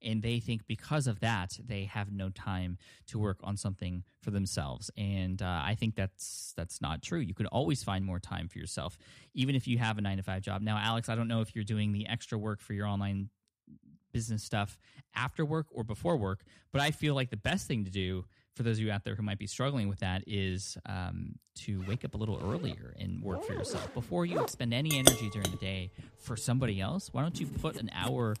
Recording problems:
household noises; very loud; from 22 s on; 1 dB above the speech

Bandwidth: 14.5 kHz